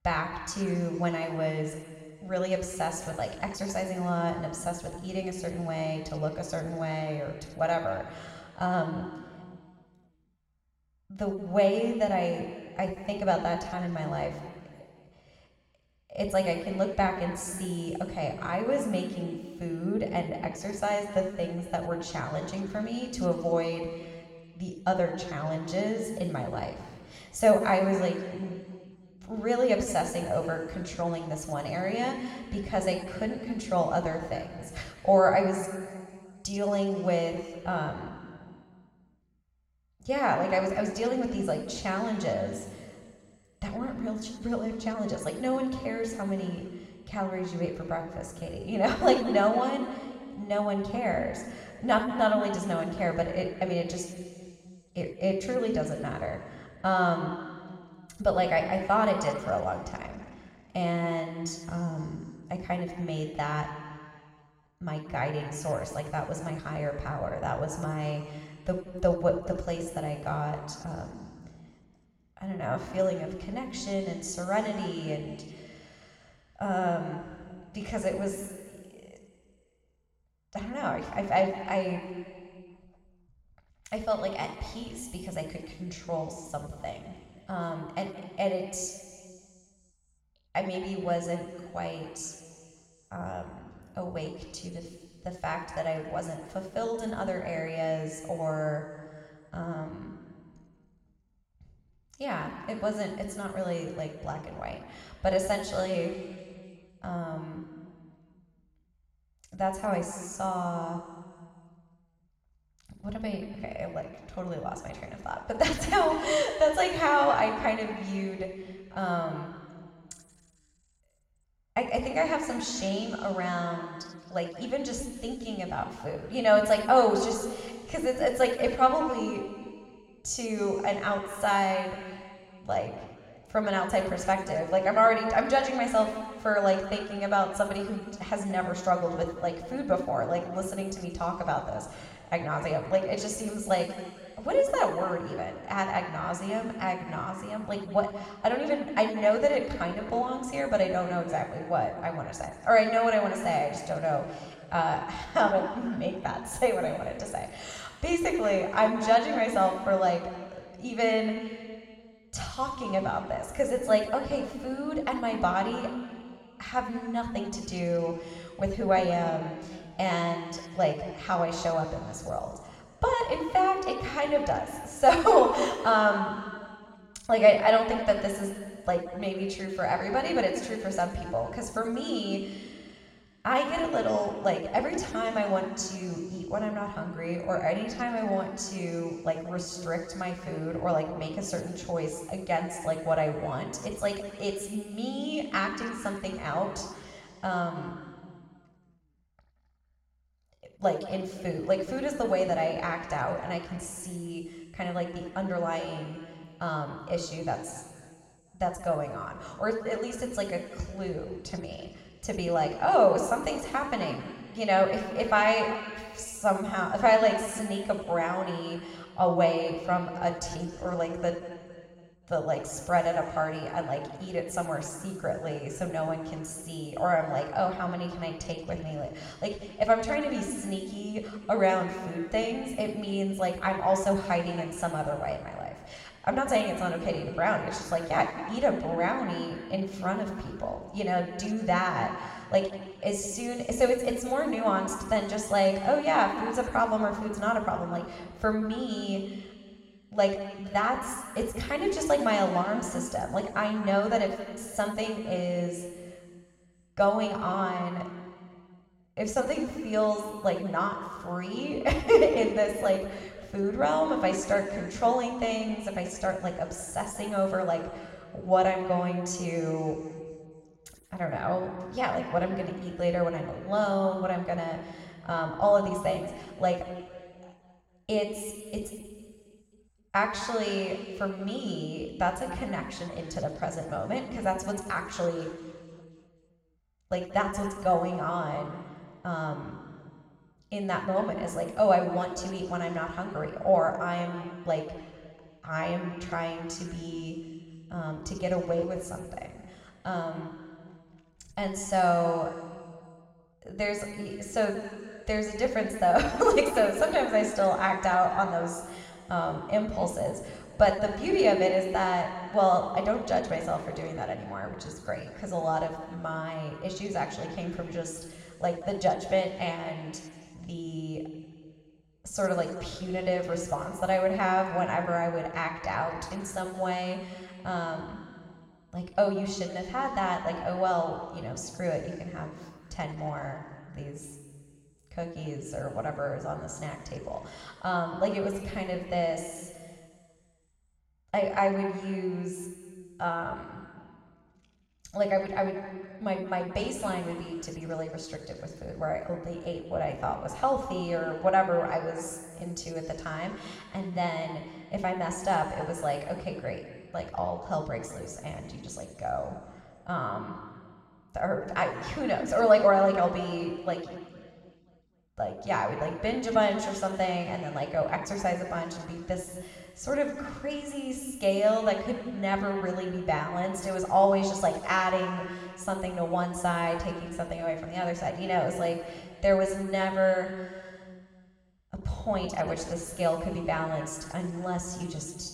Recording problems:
room echo; noticeable; dies away in 1.9 s
off-mic speech; somewhat distant

